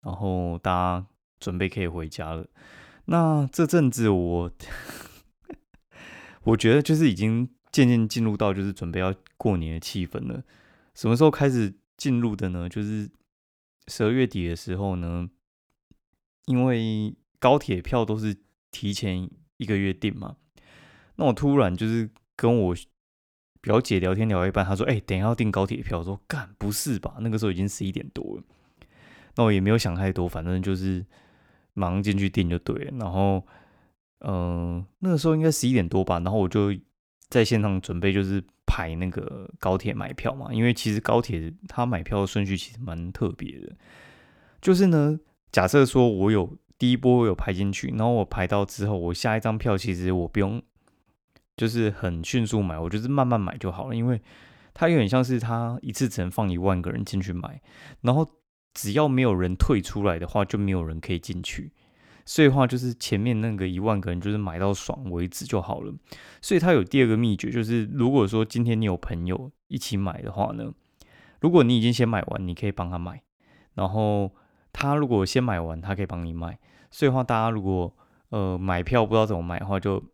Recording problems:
none

